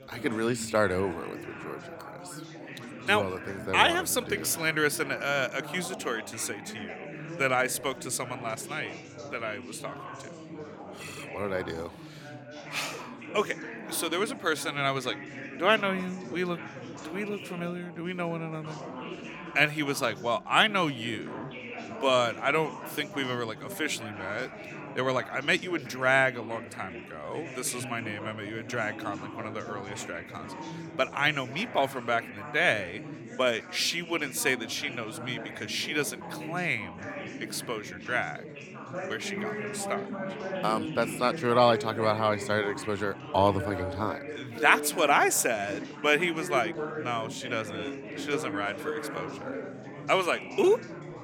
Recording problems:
chatter from many people; noticeable; throughout; 10 dB below the speech

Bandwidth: 18.5 kHz